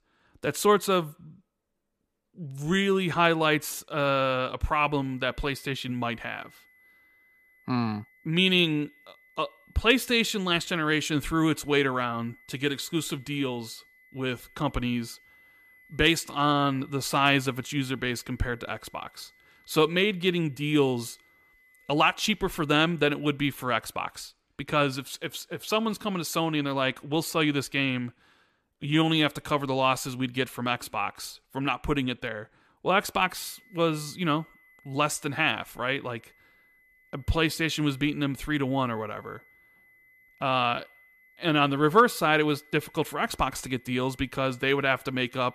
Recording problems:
high-pitched whine; faint; from 5 to 23 s and from 33 s on; 2 kHz, 30 dB below the speech

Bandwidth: 14.5 kHz